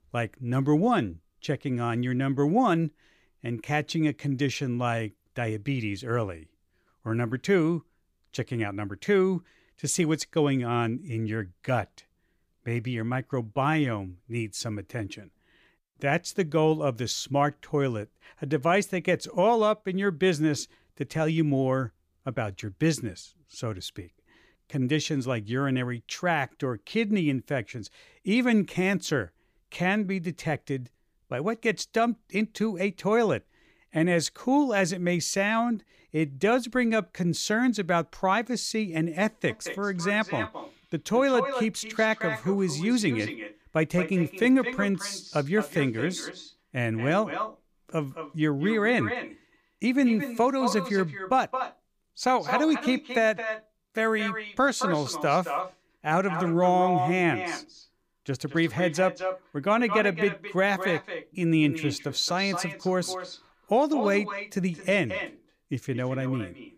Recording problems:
echo of what is said; strong; from 39 s on; 220 ms later, 8 dB below the speech

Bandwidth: 15 kHz